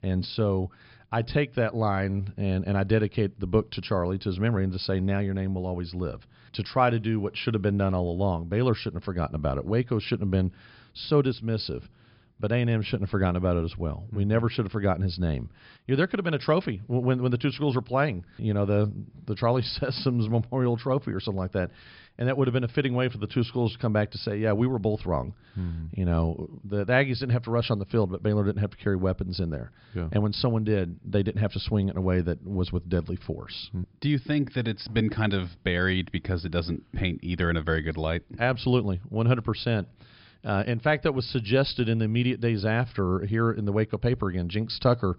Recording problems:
high frequencies cut off; noticeable; nothing above 5.5 kHz

